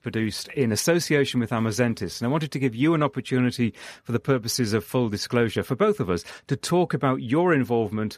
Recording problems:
none

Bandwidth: 14.5 kHz